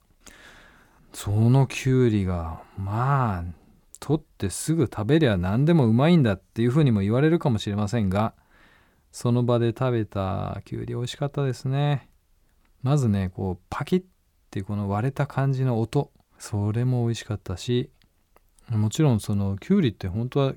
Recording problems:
none

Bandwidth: 18 kHz